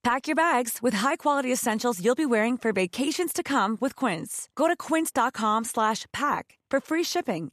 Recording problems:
none

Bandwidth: 14 kHz